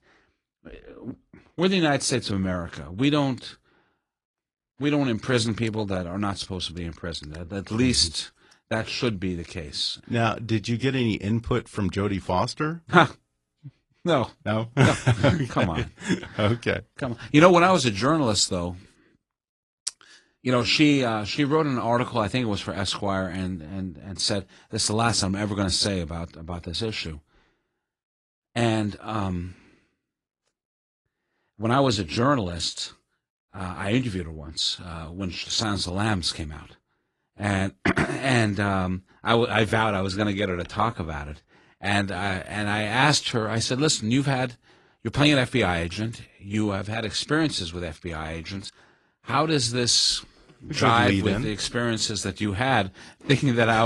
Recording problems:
garbled, watery; slightly
abrupt cut into speech; at the end

